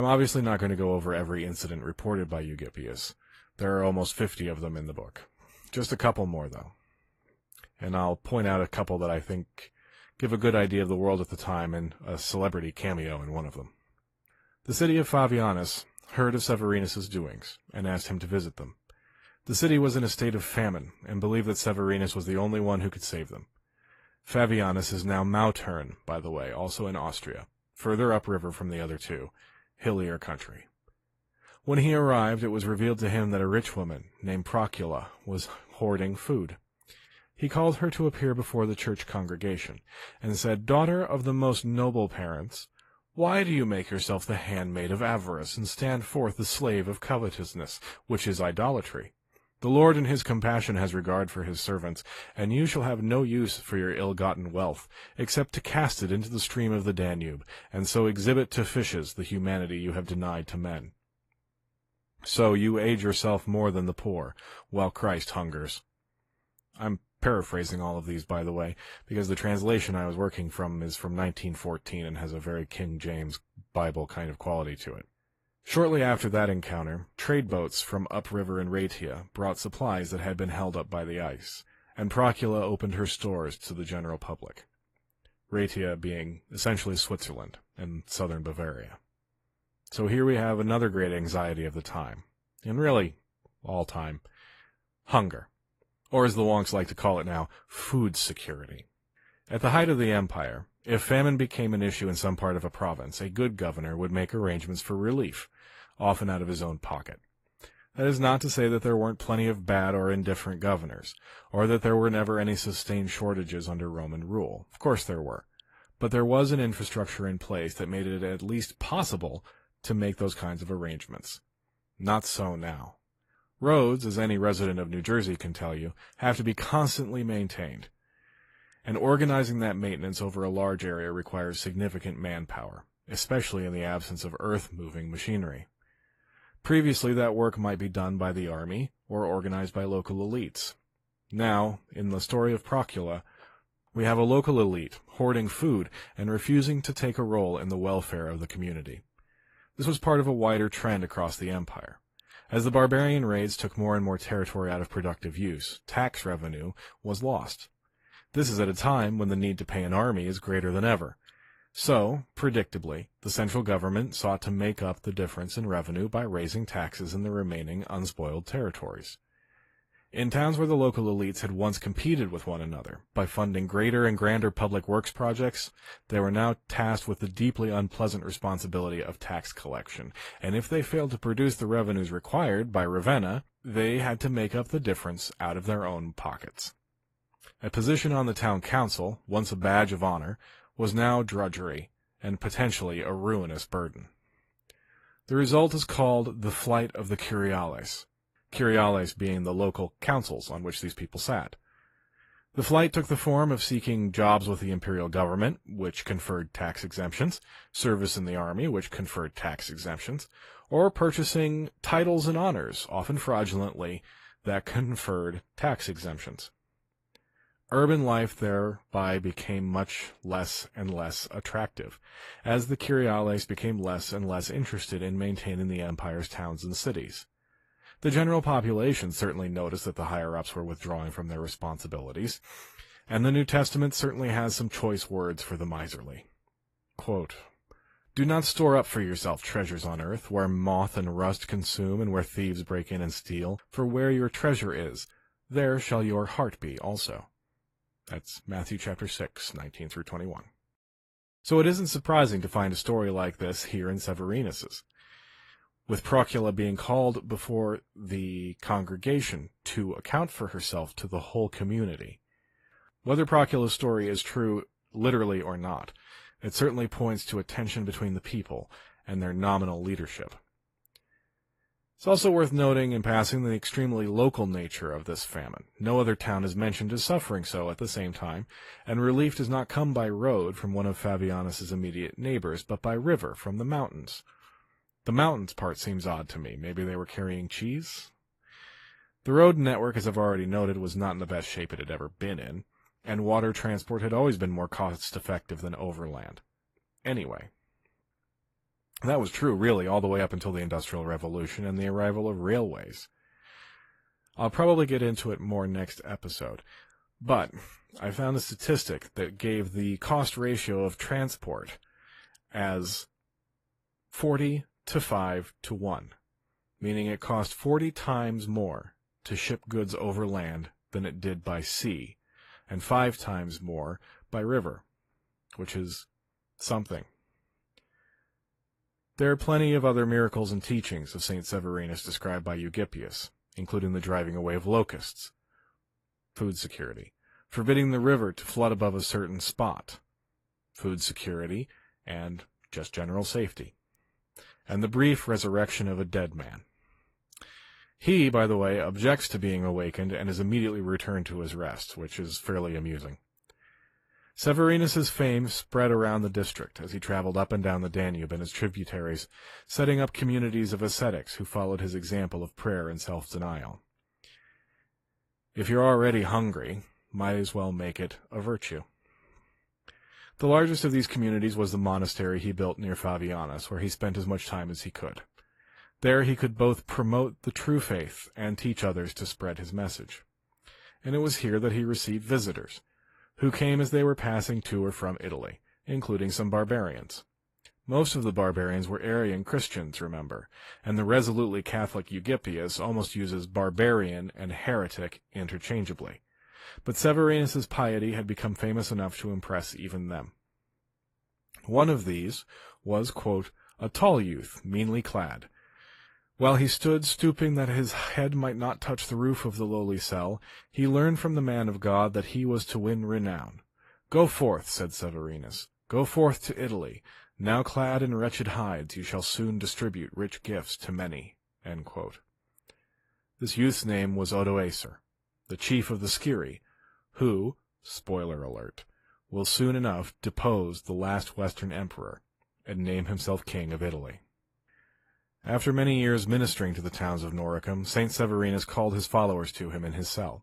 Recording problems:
garbled, watery; slightly; nothing above 12.5 kHz
abrupt cut into speech; at the start

